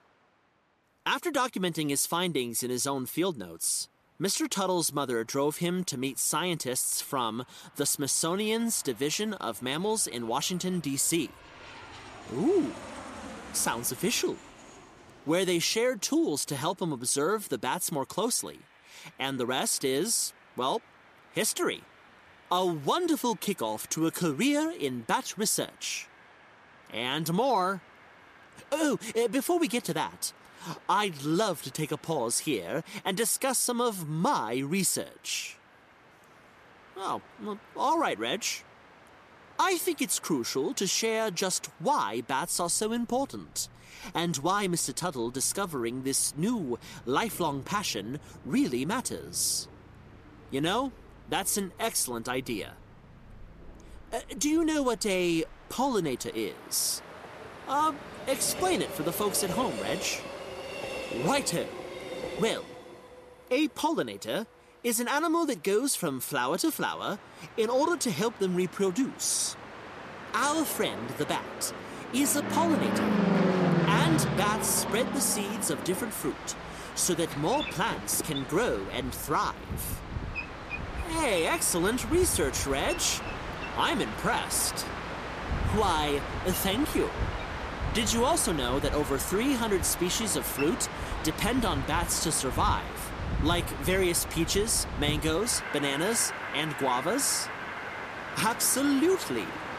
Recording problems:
train or aircraft noise; loud; throughout; 6 dB below the speech

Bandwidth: 14.5 kHz